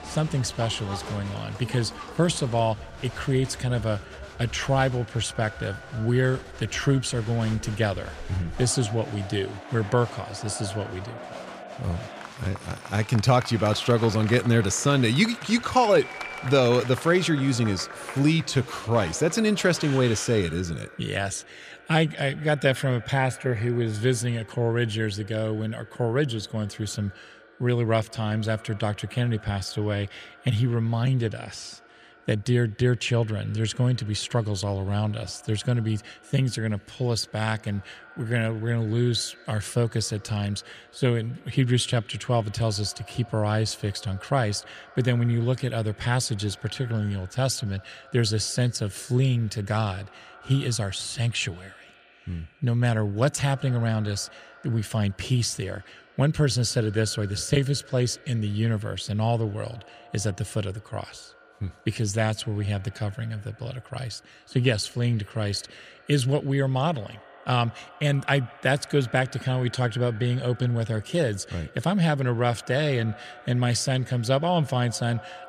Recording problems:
echo of what is said; faint; throughout; 170 ms later, 20 dB below the speech
crowd noise; noticeable; until 20 s; 15 dB below the speech

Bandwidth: 15 kHz